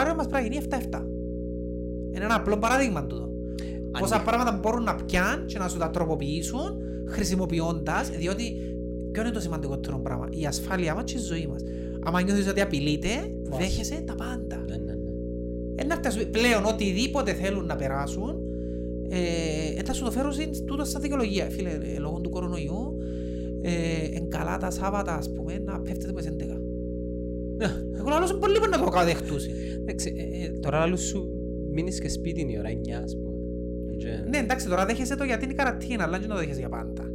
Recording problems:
electrical hum; loud; throughout; 60 Hz, 9 dB below the speech
abrupt cut into speech; at the start

